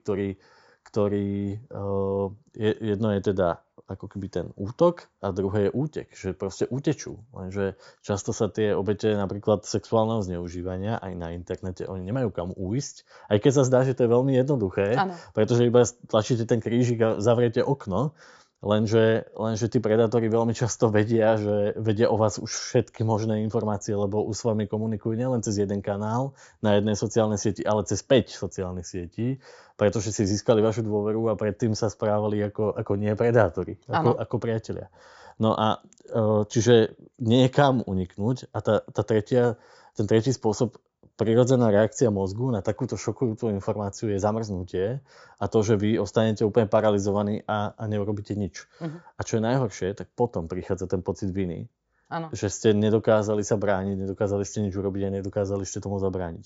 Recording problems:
high frequencies cut off; noticeable; nothing above 7.5 kHz

